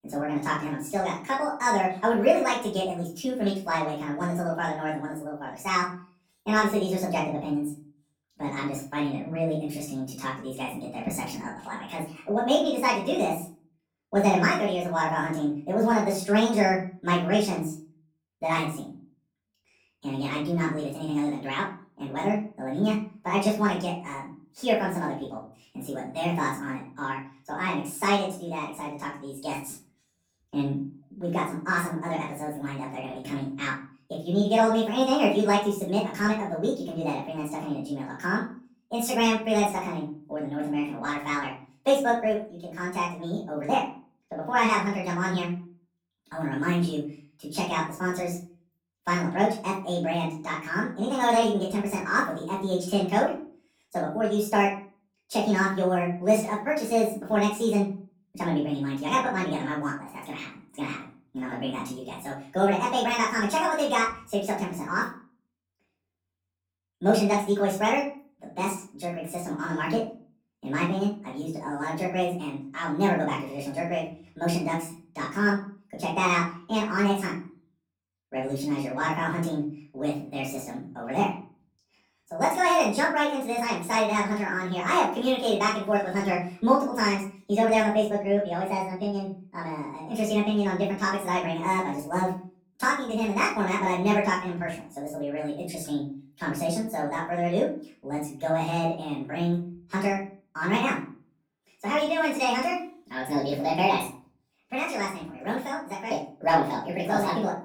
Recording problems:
off-mic speech; far
wrong speed and pitch; too fast and too high; 1.5 times normal speed
room echo; slight; dies away in 0.4 s

